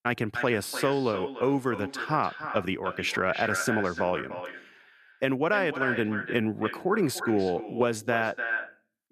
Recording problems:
echo of what is said; strong; throughout; 300 ms later, 7 dB below the speech

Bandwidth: 14 kHz